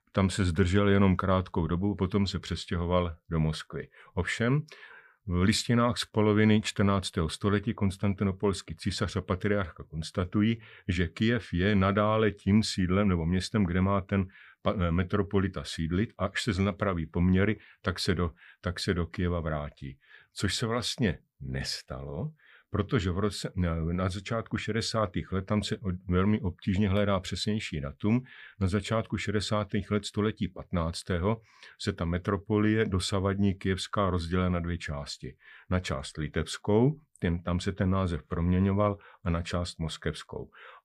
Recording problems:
none

